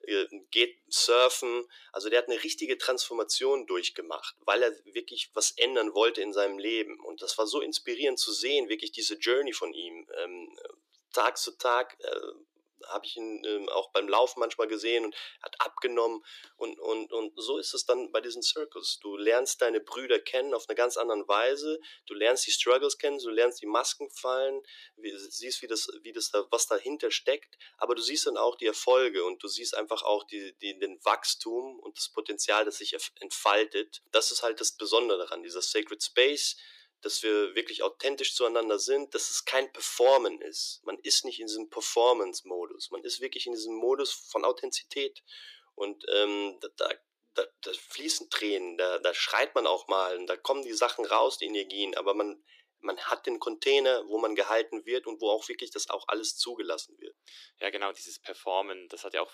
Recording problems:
thin; very; fading below 300 Hz

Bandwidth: 14.5 kHz